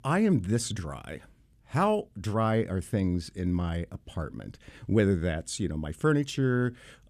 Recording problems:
none

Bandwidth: 14 kHz